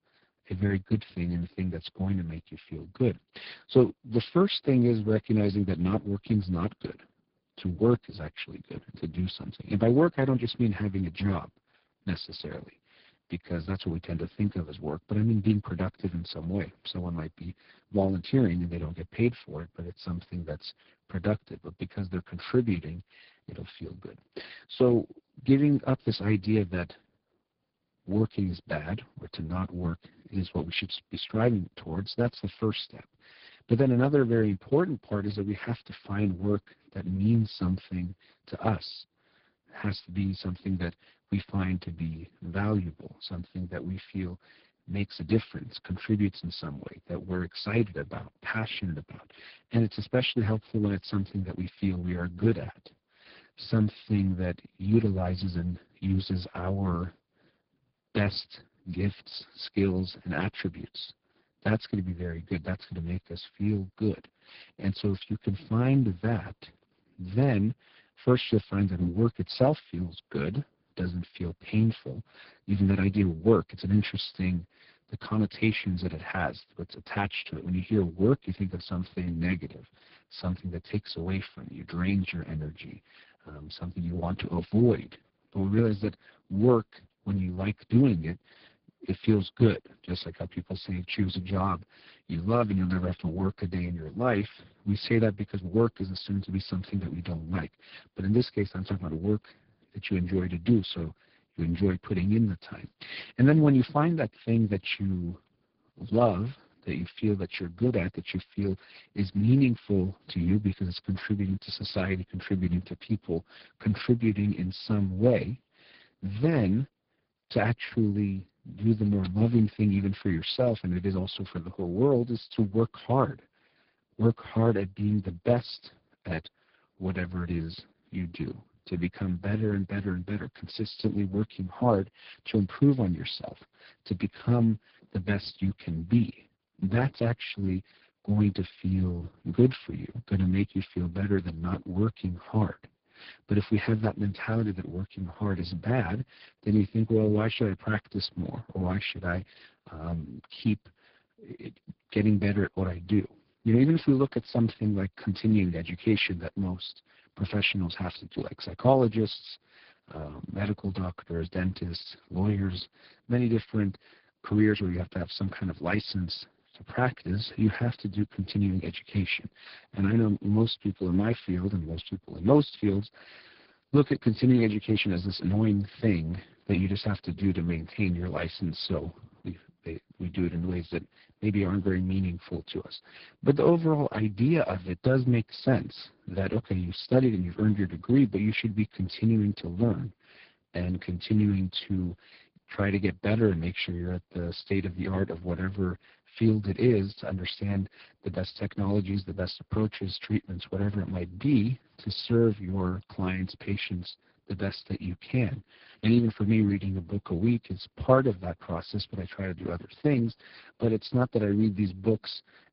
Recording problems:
garbled, watery; badly
high frequencies cut off; severe; nothing above 5 kHz

